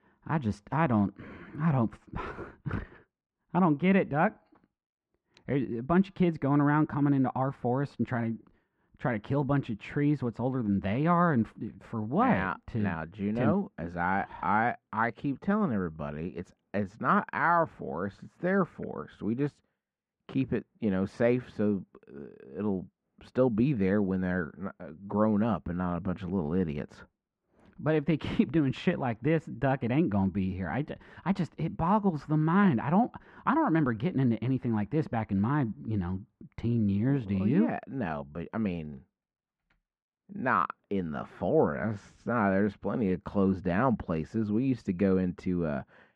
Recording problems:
muffled; very; fading above 1.5 kHz

